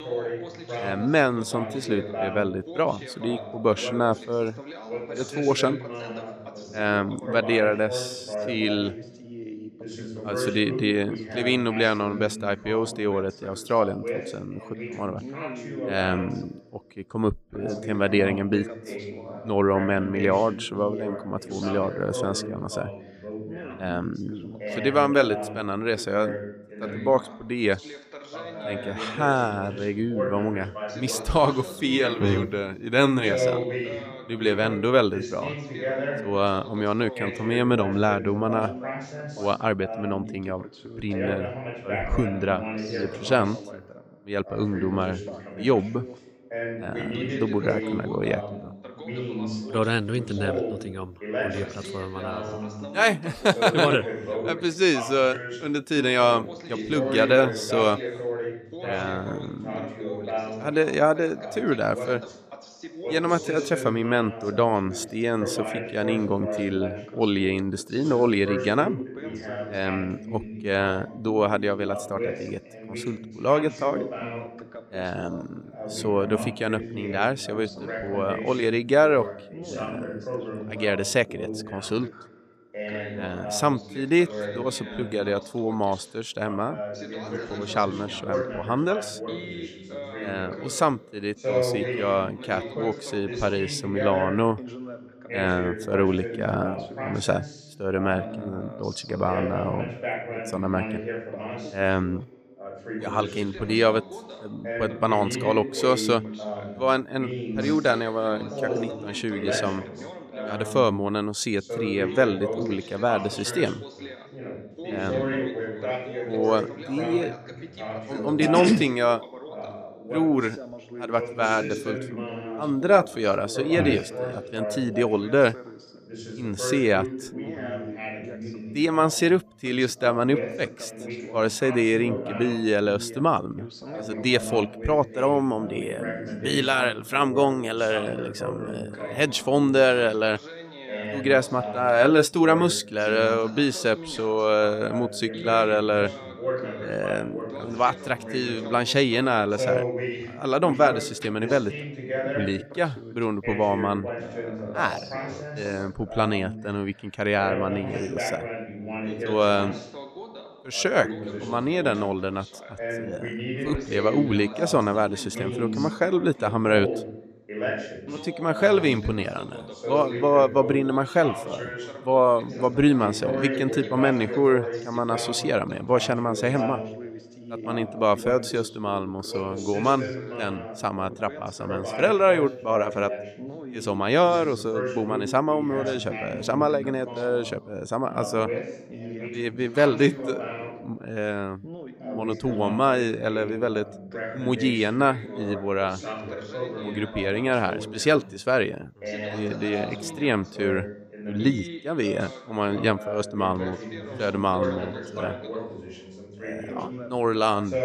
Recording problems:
background chatter; loud; throughout; 2 voices, 9 dB below the speech

